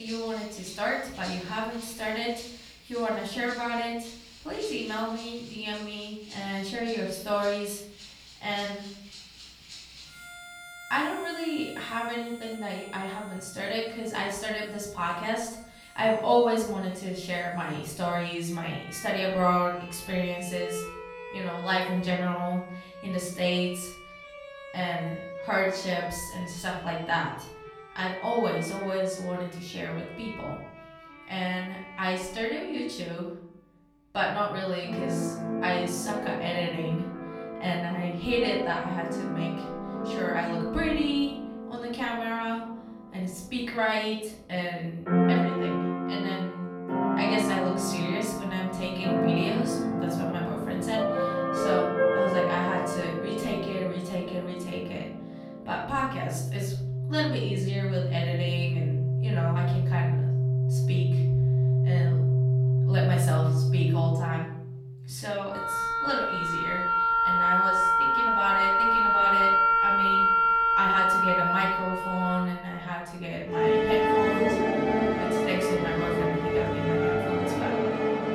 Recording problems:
off-mic speech; far
room echo; noticeable; dies away in 0.7 s
background music; very loud; throughout; 5 dB above the speech
abrupt cut into speech; at the start

